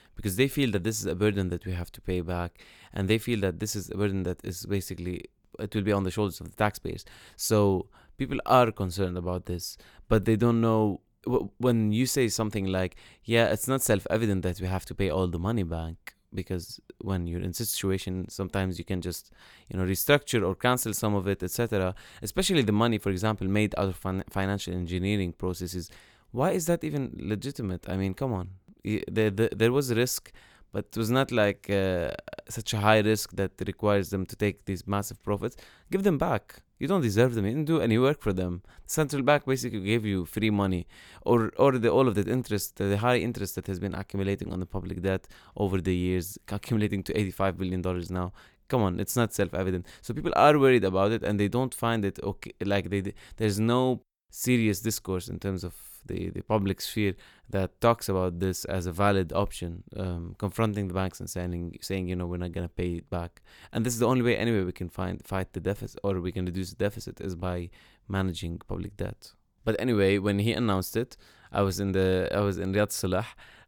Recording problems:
none

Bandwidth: 18.5 kHz